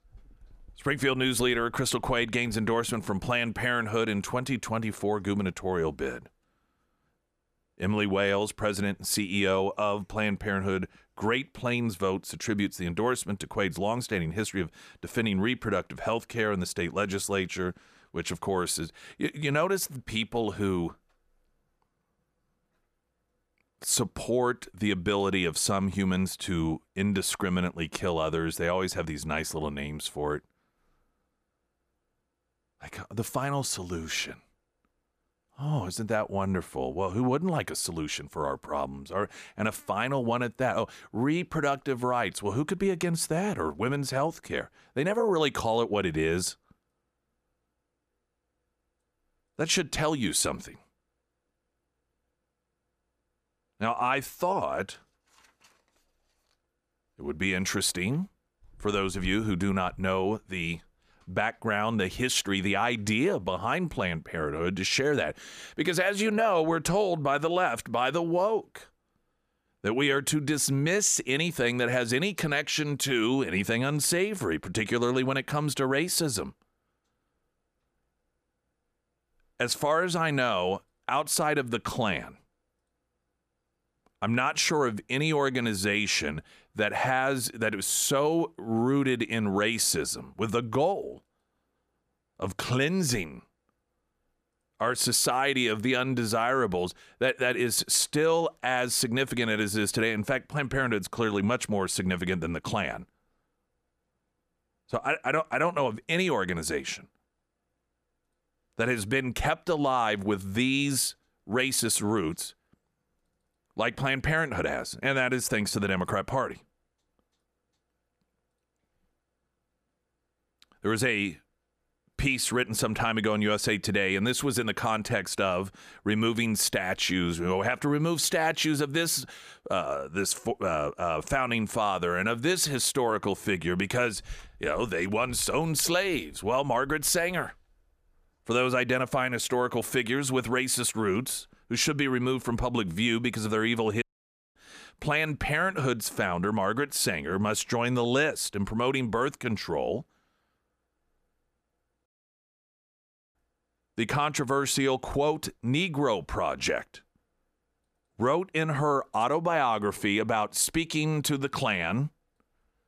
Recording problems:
audio cutting out; at 2:24 for 0.5 s and at 2:32 for 1.5 s

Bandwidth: 14.5 kHz